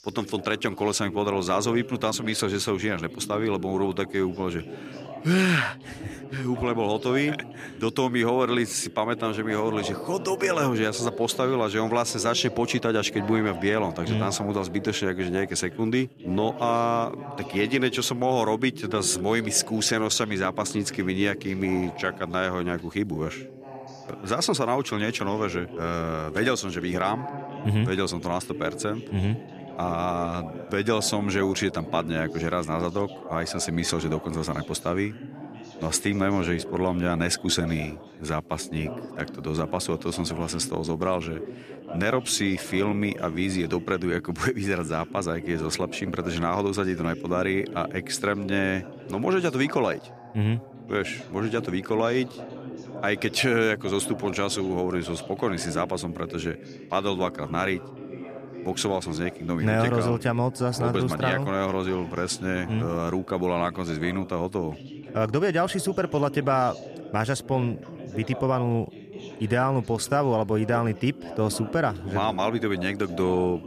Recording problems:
background chatter; noticeable; throughout; 3 voices, 15 dB below the speech

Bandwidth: 14.5 kHz